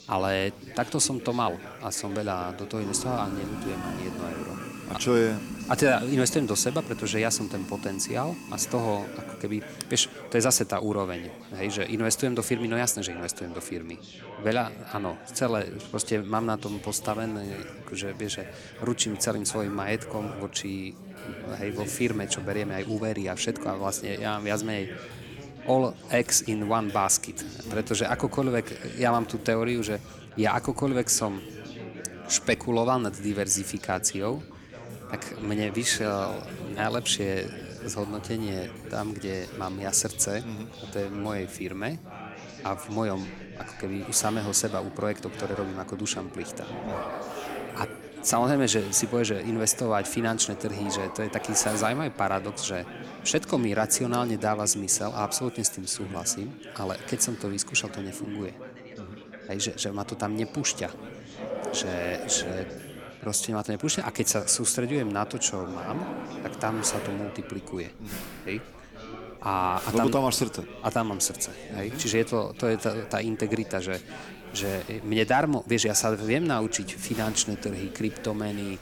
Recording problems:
household noises; noticeable; throughout; 15 dB below the speech
chatter from many people; noticeable; throughout; 15 dB below the speech

